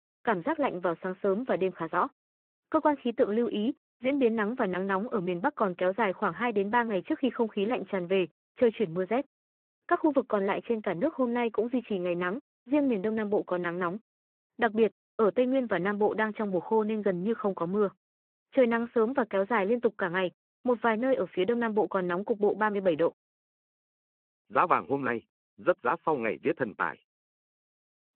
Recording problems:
phone-call audio

